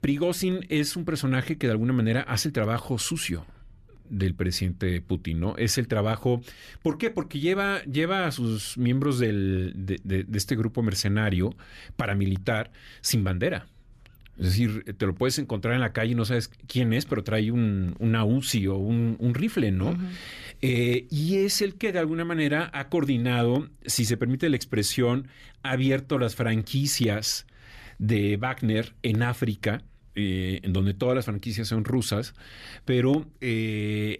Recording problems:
none

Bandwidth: 14.5 kHz